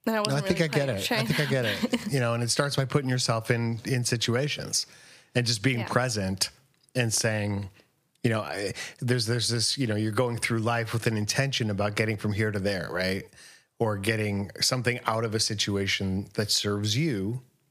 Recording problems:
squashed, flat; somewhat

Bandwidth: 15 kHz